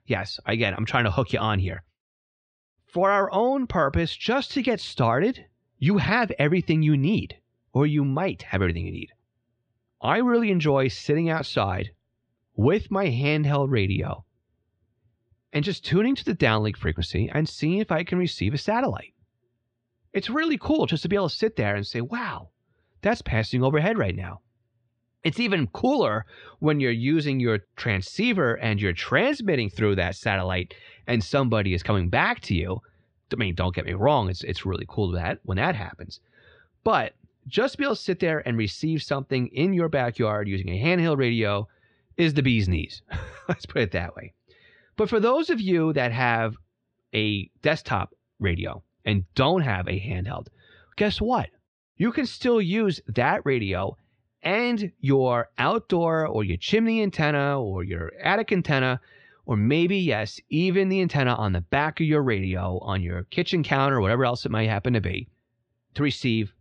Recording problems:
muffled; slightly; fading above 3 kHz

